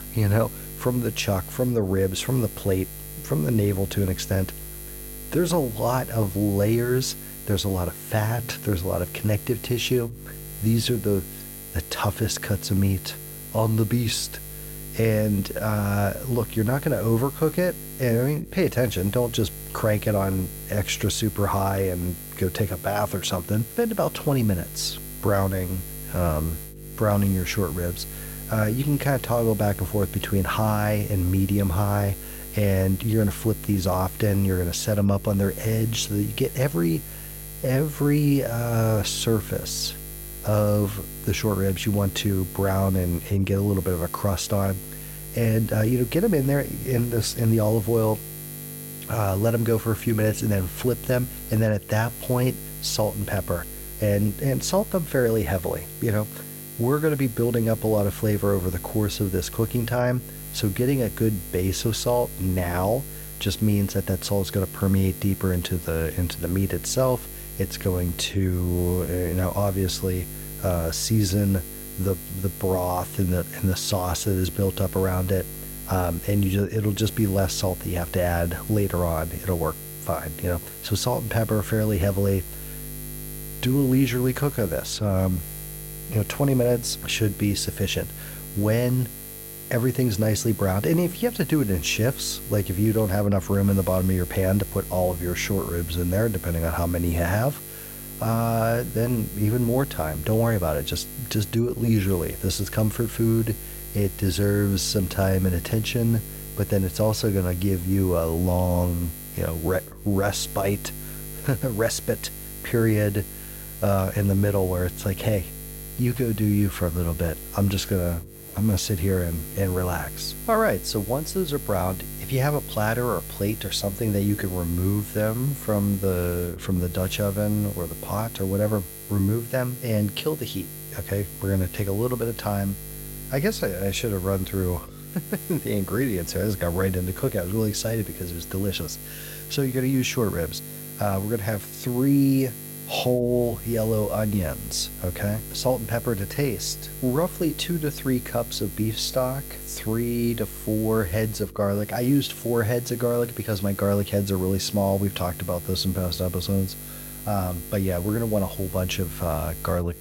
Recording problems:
electrical hum; noticeable; throughout; 50 Hz, 15 dB below the speech

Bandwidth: 16.5 kHz